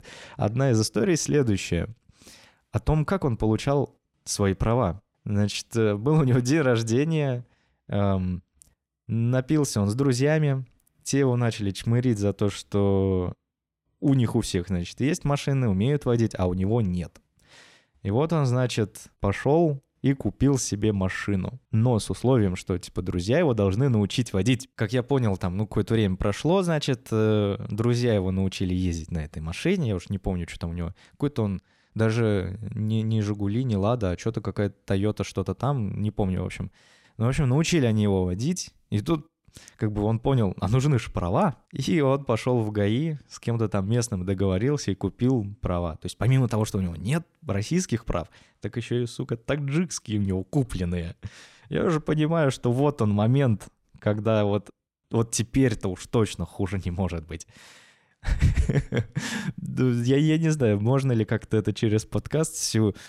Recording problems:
none

